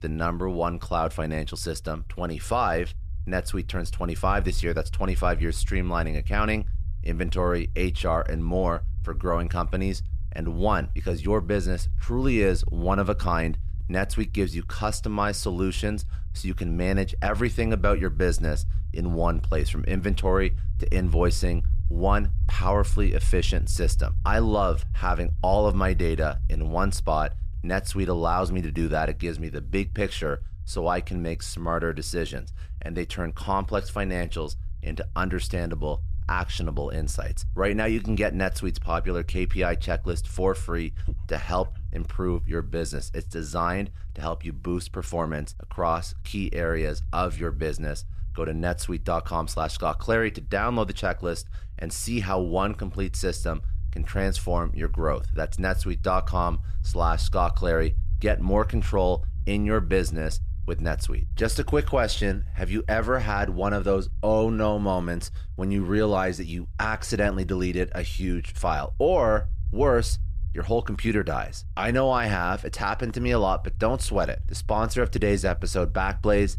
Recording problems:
low rumble; faint; throughout; 25 dB below the speech
dog barking; faint; at 41 s; peak 10 dB below the speech

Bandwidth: 14 kHz